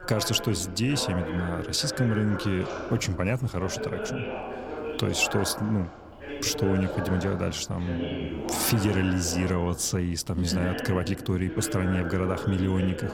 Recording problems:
voice in the background; loud; throughout; 7 dB below the speech

